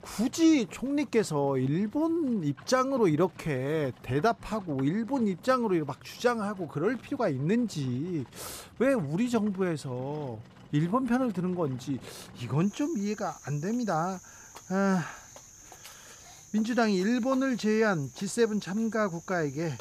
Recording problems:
animal sounds; faint; throughout; 20 dB below the speech

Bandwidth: 14.5 kHz